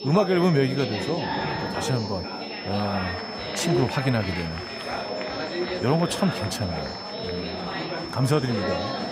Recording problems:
chatter from many people; loud; throughout; 4 dB below the speech
high-pitched whine; noticeable; throughout; 5.5 kHz, 10 dB below the speech

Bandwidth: 15.5 kHz